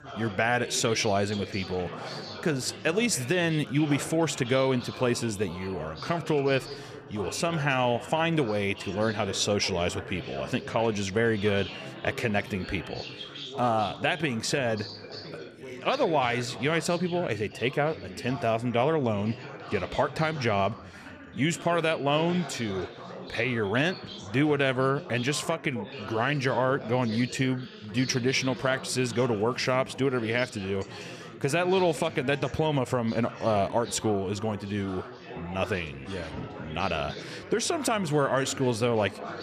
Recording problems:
chatter from many people; noticeable; throughout; 15 dB below the speech

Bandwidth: 14.5 kHz